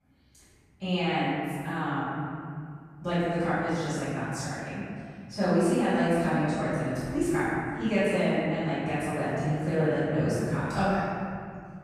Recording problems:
room echo; strong; dies away in 2.3 s
off-mic speech; far

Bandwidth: 14.5 kHz